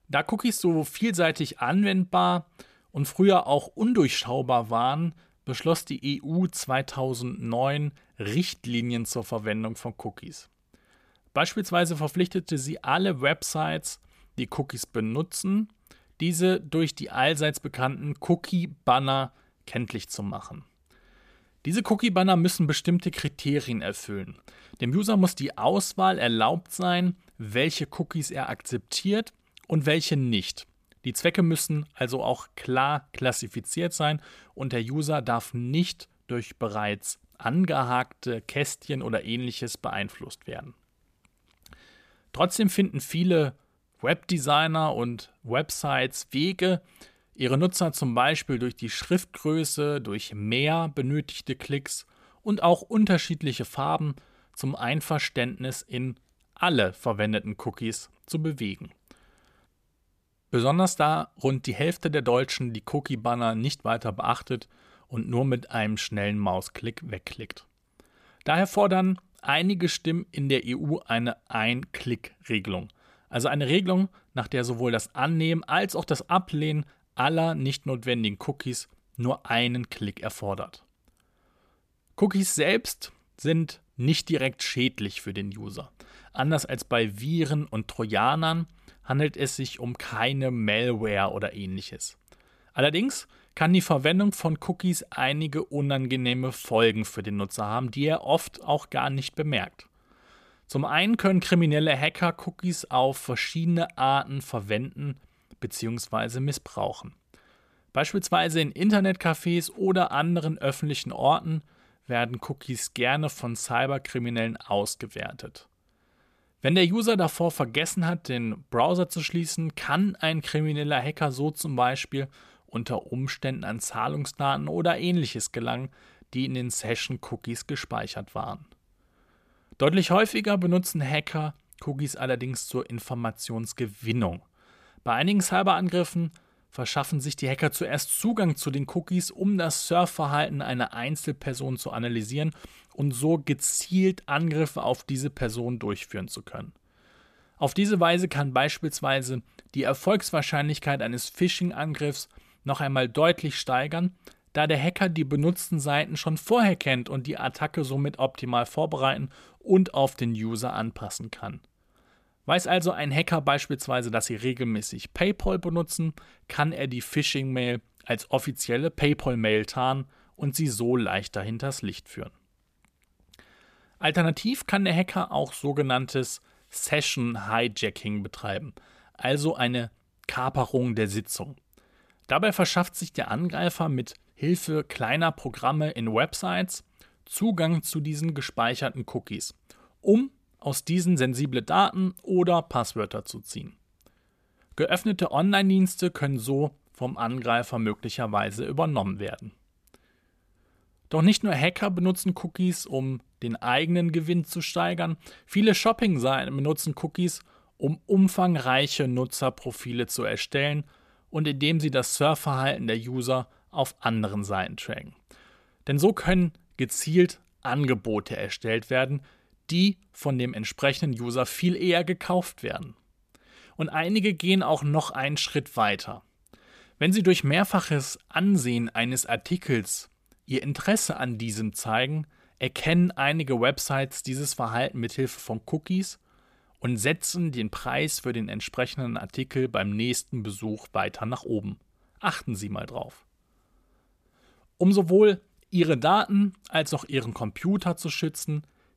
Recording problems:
none

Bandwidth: 14.5 kHz